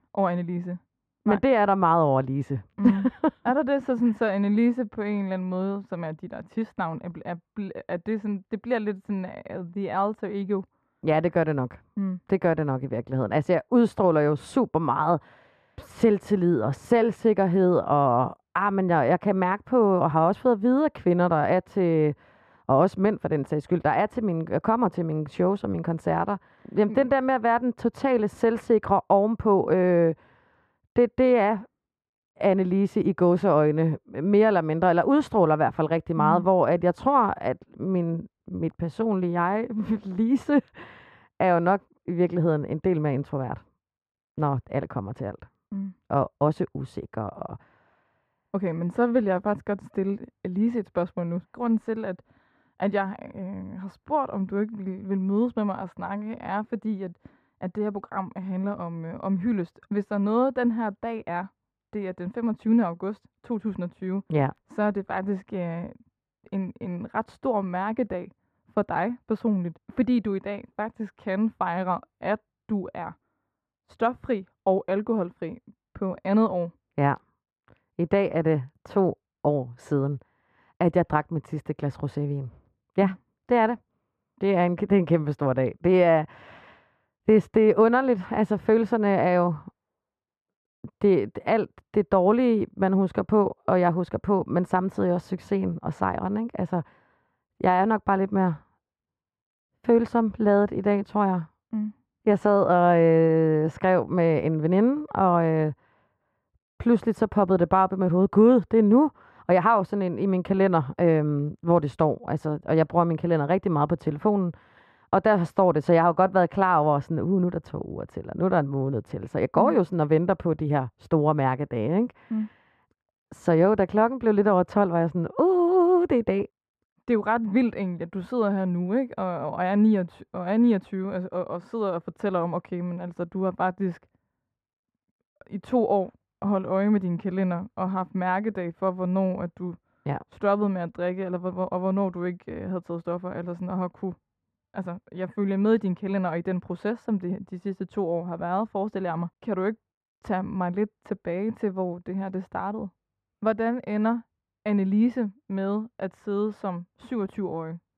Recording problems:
muffled; very; fading above 2.5 kHz

